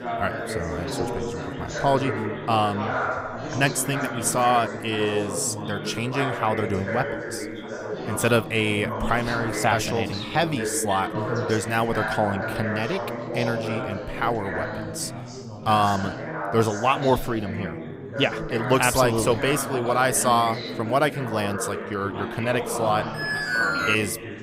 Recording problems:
background chatter; loud; throughout; 4 voices, 6 dB below the speech
alarm; loud; at 23 s; peak 2 dB above the speech

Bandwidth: 15.5 kHz